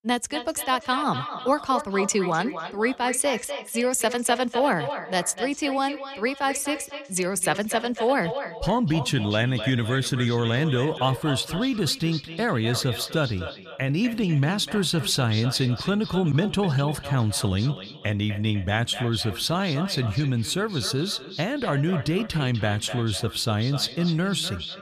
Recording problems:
echo of what is said; strong; throughout; 250 ms later, 10 dB below the speech

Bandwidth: 14.5 kHz